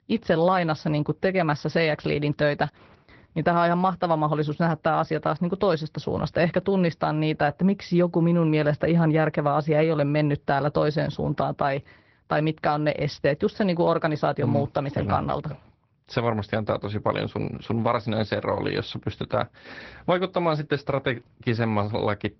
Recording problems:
high frequencies cut off; noticeable; nothing above 5.5 kHz
garbled, watery; slightly

